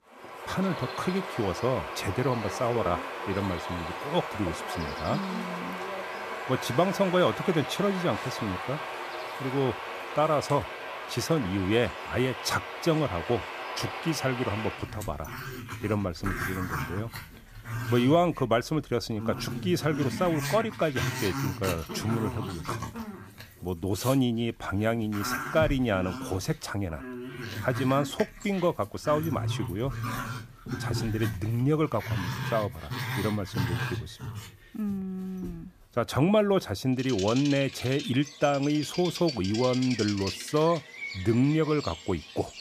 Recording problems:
animal sounds; loud; throughout; 7 dB below the speech

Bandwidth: 14.5 kHz